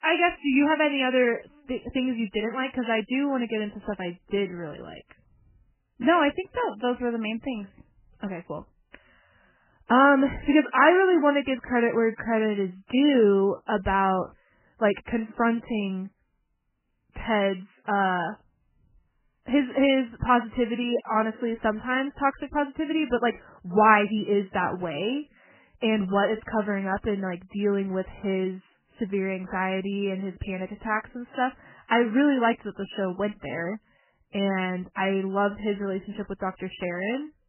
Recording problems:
garbled, watery; badly; nothing above 3 kHz

